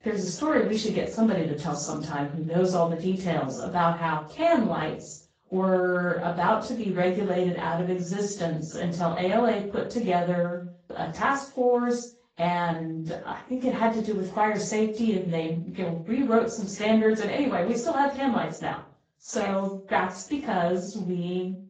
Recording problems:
off-mic speech; far
room echo; slight; dies away in 0.3 s
garbled, watery; slightly; nothing above 7.5 kHz

